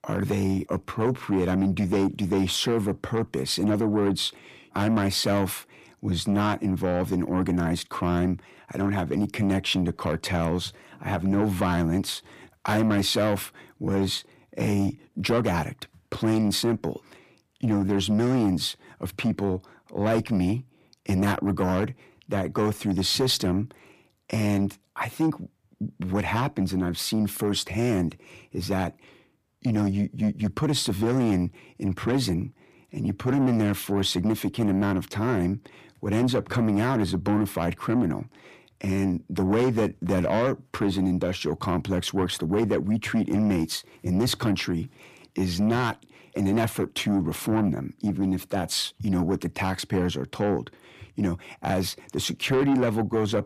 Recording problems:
distortion; slight; 10 dB below the speech

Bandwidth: 15 kHz